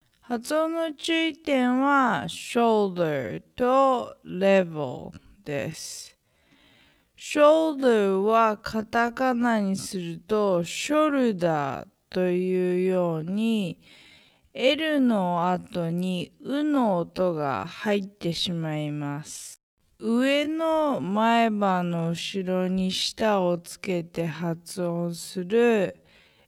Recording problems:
wrong speed, natural pitch; too slow; 0.5 times normal speed

